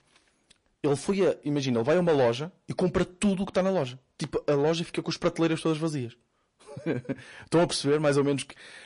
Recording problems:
distortion; slight; 10 dB below the speech
garbled, watery; slightly; nothing above 10.5 kHz

